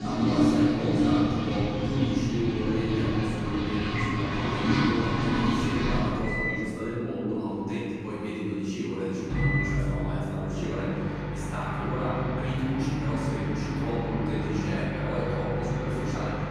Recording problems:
room echo; strong; dies away in 2.4 s
off-mic speech; far
household noises; very loud; throughout; 3 dB above the speech

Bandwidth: 15 kHz